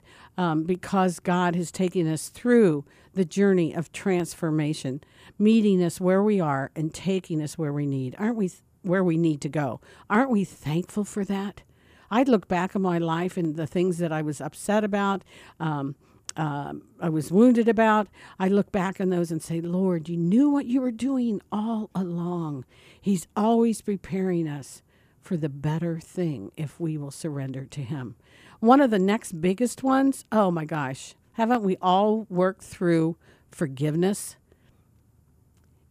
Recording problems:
none

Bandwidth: 14.5 kHz